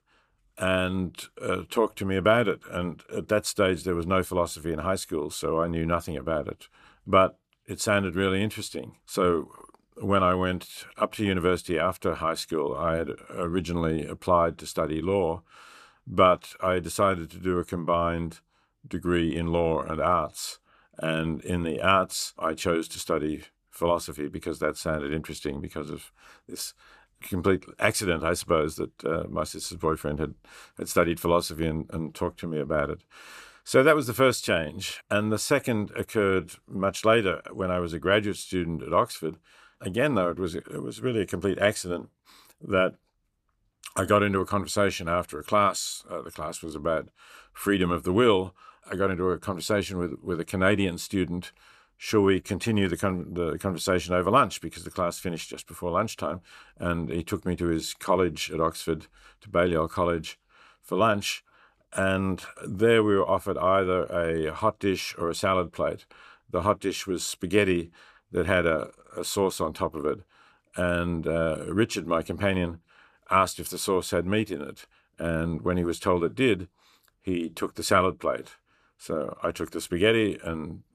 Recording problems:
none

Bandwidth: 14.5 kHz